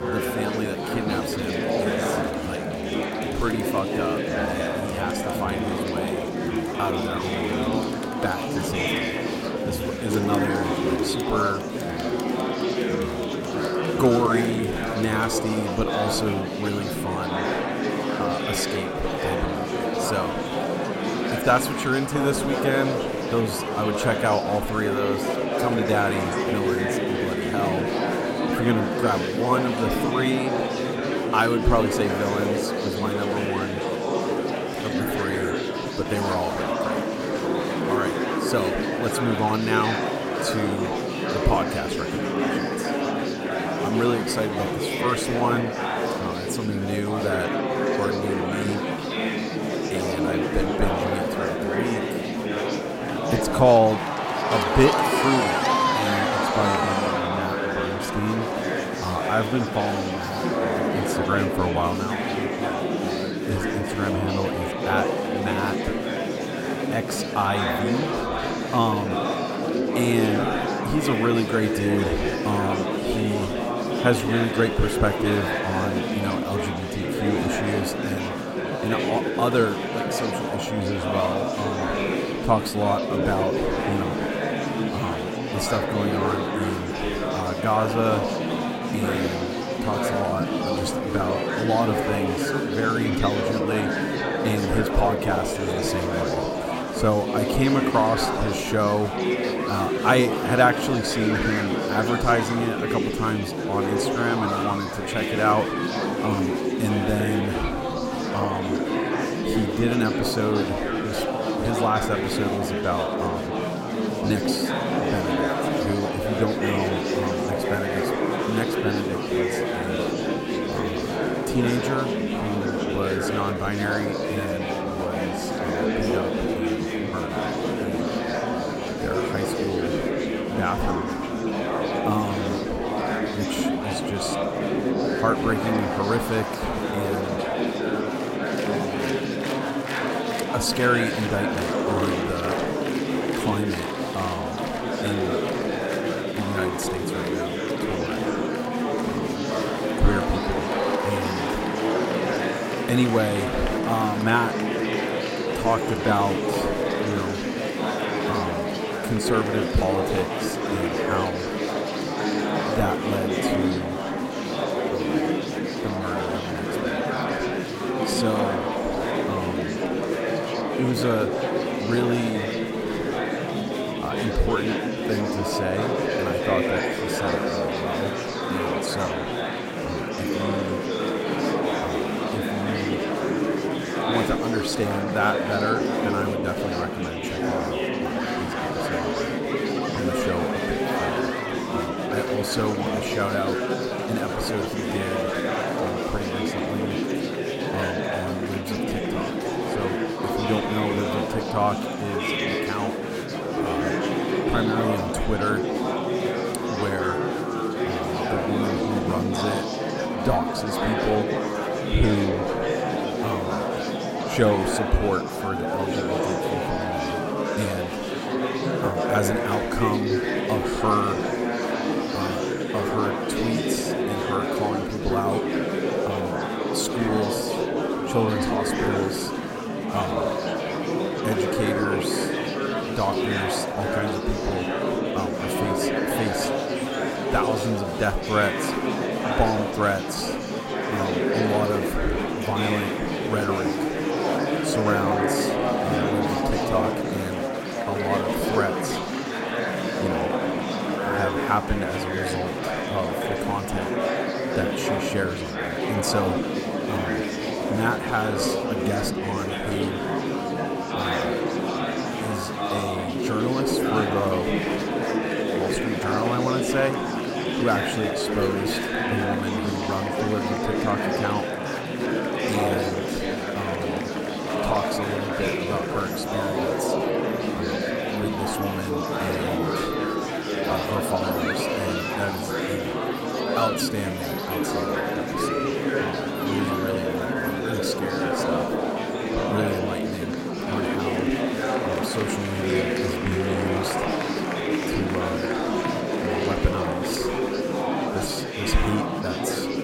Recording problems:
murmuring crowd; very loud; throughout; 2 dB above the speech

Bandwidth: 16 kHz